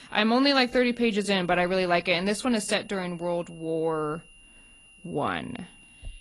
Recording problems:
garbled, watery; slightly; nothing above 11 kHz
high-pitched whine; faint; throughout; 3 kHz, 25 dB below the speech

